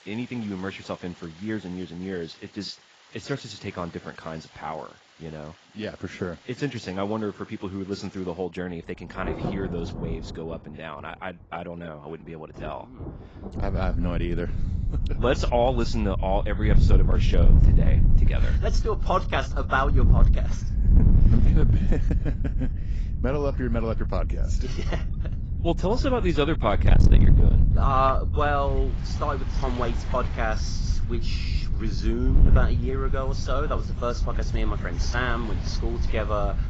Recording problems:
garbled, watery; badly; nothing above 7.5 kHz
distortion; slight; 2% of the sound clipped
wind noise on the microphone; heavy; from 14 s on; 10 dB below the speech
rain or running water; noticeable; throughout; 15 dB below the speech

